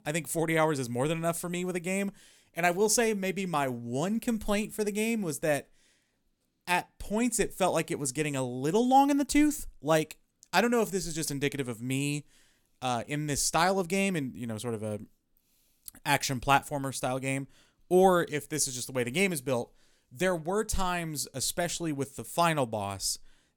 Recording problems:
none

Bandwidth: 17.5 kHz